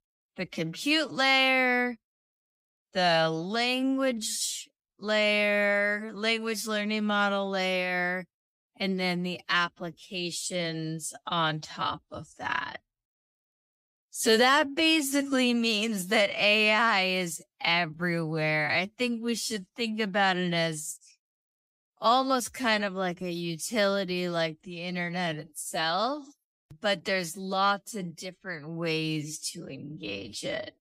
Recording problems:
wrong speed, natural pitch; too slow; 0.6 times normal speed

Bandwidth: 15.5 kHz